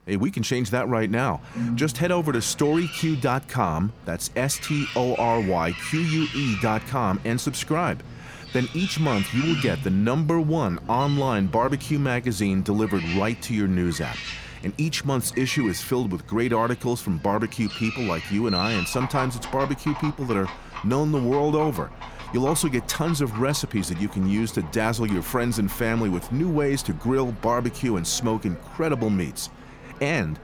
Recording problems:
animal sounds; noticeable; throughout; 10 dB below the speech

